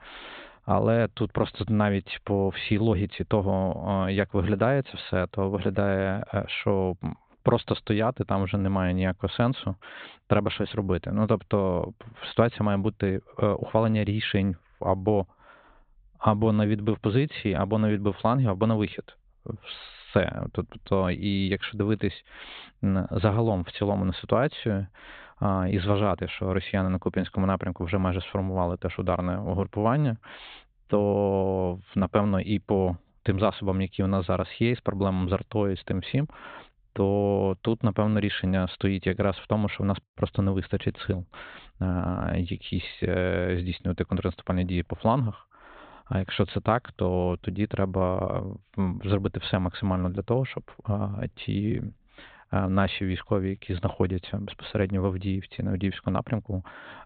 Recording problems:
high frequencies cut off; severe; nothing above 4 kHz

